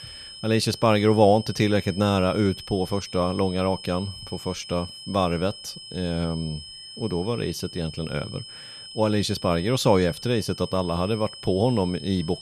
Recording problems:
high-pitched whine; noticeable; throughout; 5 kHz, 15 dB below the speech

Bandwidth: 14.5 kHz